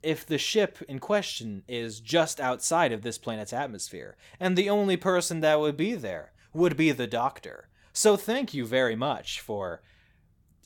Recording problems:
none

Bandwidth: 17.5 kHz